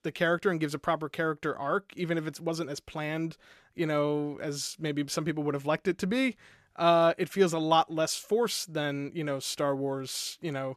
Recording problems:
none

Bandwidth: 13.5 kHz